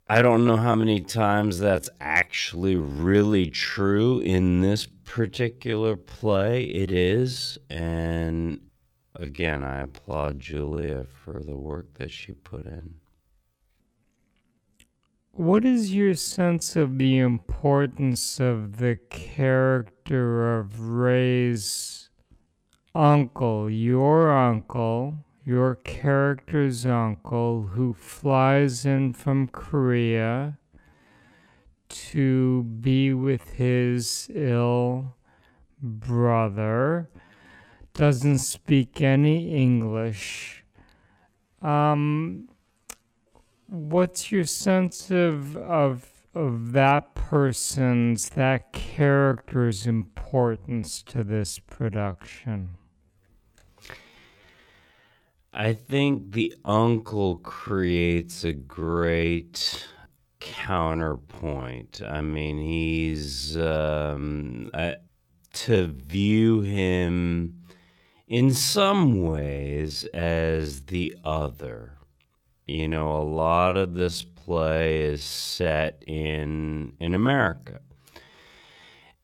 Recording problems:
wrong speed, natural pitch; too slow; 0.5 times normal speed

